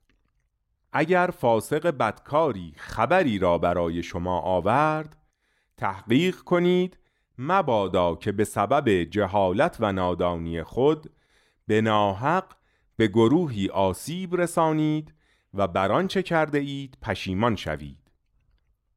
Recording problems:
none

